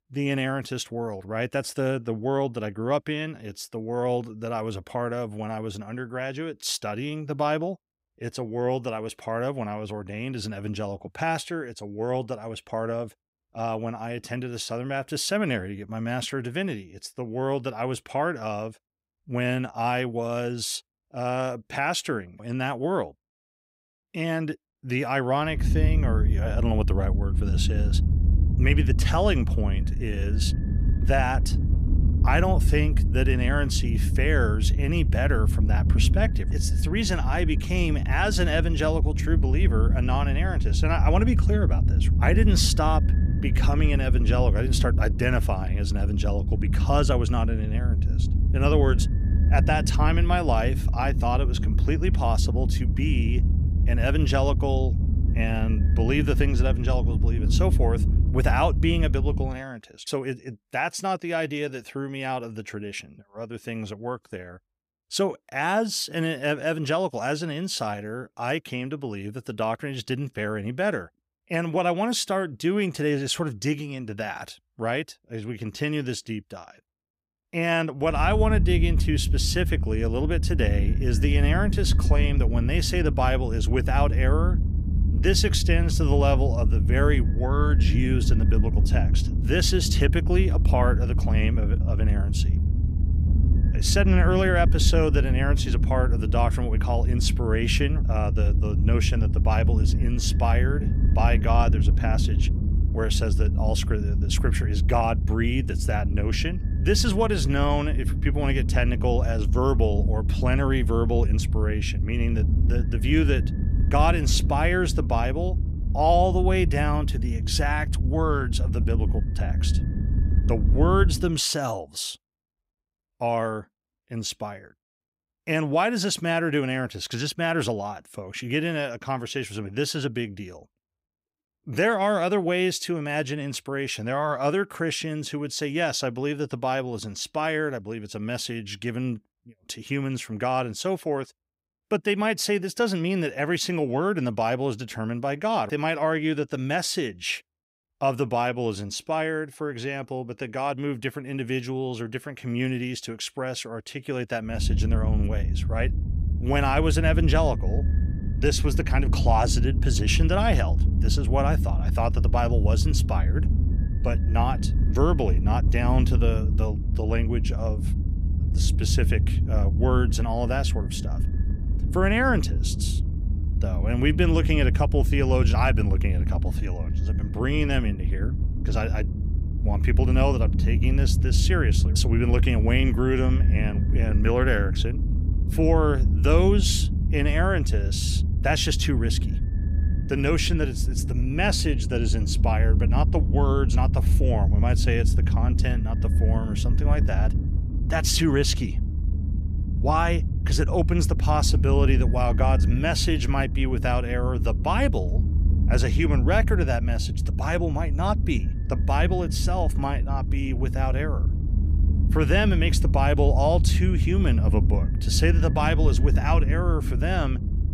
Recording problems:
low rumble; noticeable; from 26 to 59 s, from 1:18 to 2:01 and from 2:35 on; 10 dB below the speech

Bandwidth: 15.5 kHz